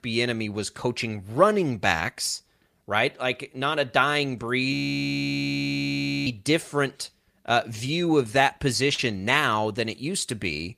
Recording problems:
audio freezing; at 4.5 s for 1.5 s

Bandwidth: 15 kHz